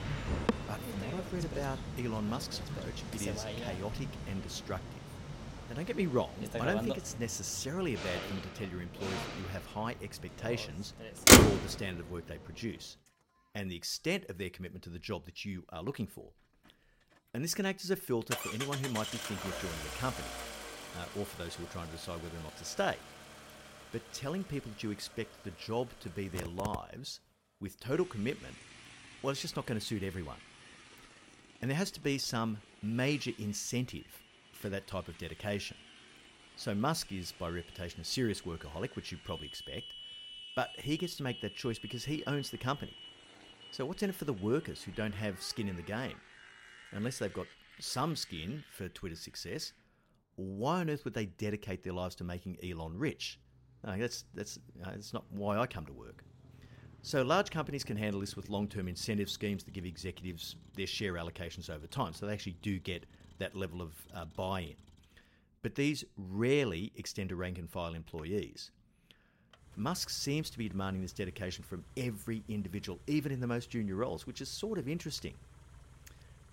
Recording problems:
traffic noise; very loud; throughout; 4 dB above the speech

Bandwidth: 16 kHz